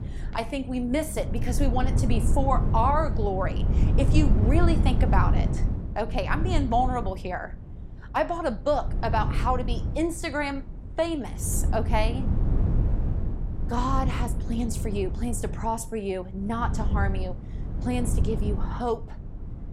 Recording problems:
wind noise on the microphone; occasional gusts; 10 dB below the speech

